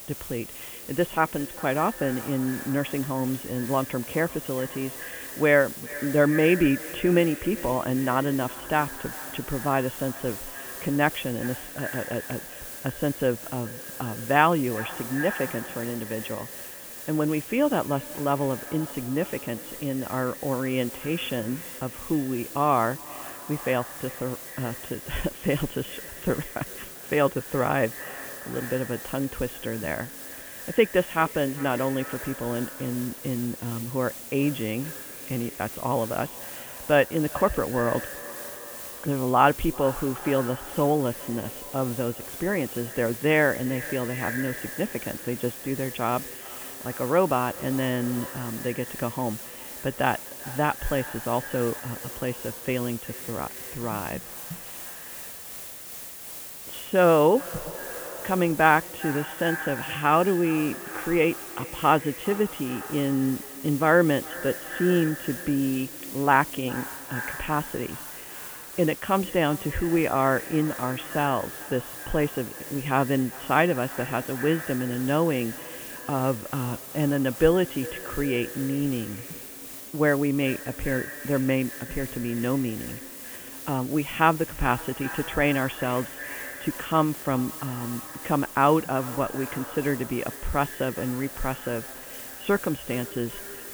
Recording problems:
high frequencies cut off; severe; nothing above 3.5 kHz
echo of what is said; noticeable; throughout; 400 ms later, 15 dB below the speech
hiss; noticeable; throughout; 10 dB below the speech

